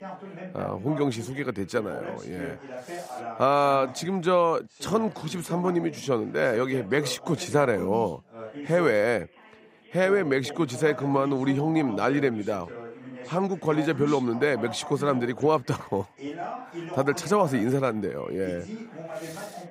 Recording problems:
background chatter; noticeable; throughout; 2 voices, 15 dB below the speech

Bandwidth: 15.5 kHz